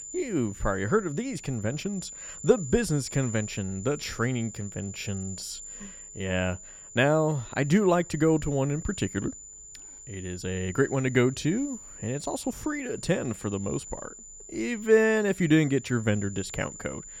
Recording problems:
high-pitched whine; noticeable; throughout; 7 kHz, 15 dB below the speech

